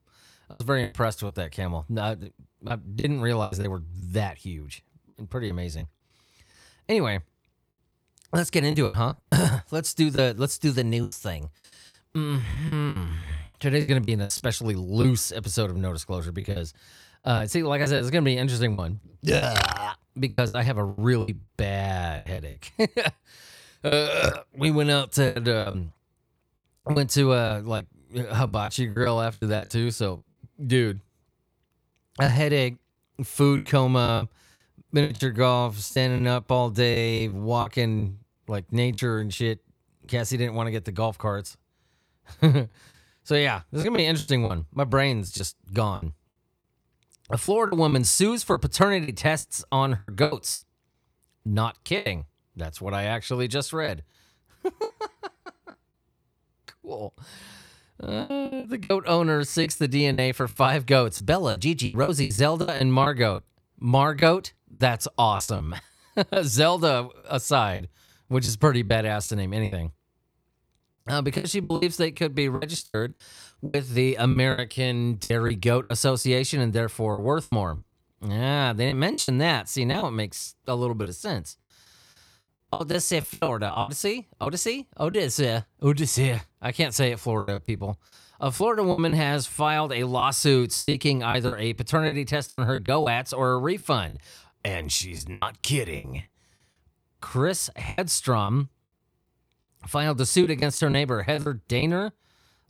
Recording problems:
choppy; very; 10% of the speech affected

